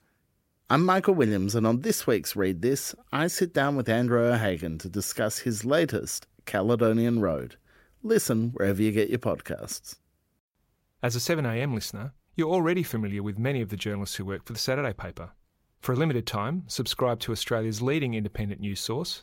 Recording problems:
none

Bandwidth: 16 kHz